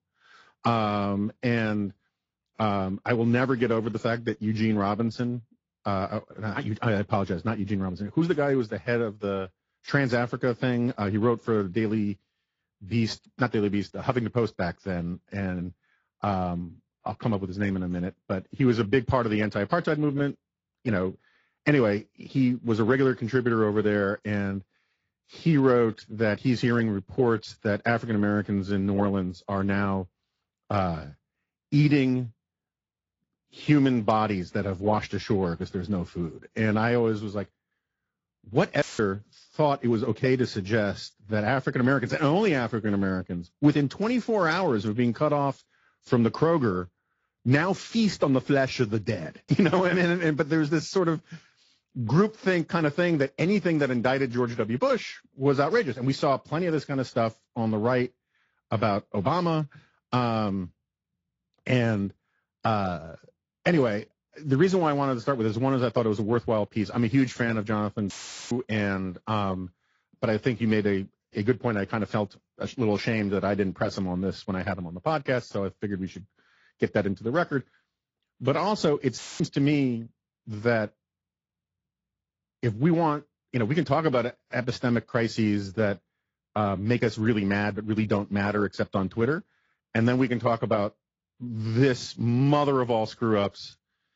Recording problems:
garbled, watery; slightly; nothing above 7.5 kHz
audio cutting out; filled with static; at 39 s, at 1:08 and at 1:19

